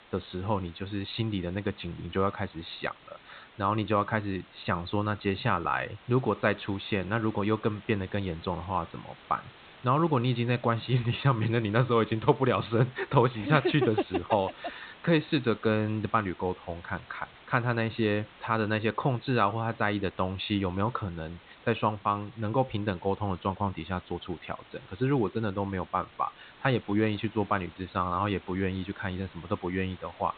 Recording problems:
high frequencies cut off; severe; nothing above 4 kHz
hiss; faint; throughout; 20 dB below the speech

